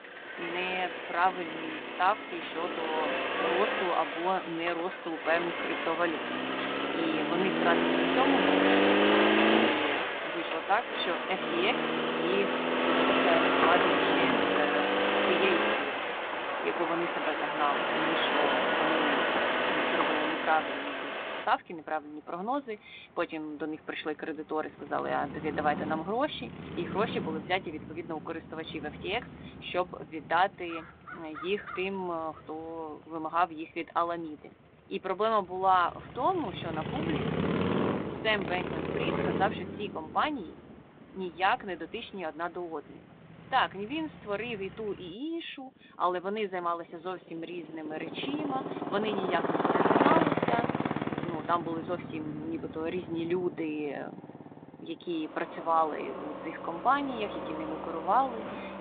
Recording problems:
phone-call audio; nothing above 4 kHz
traffic noise; very loud; throughout; 3 dB above the speech

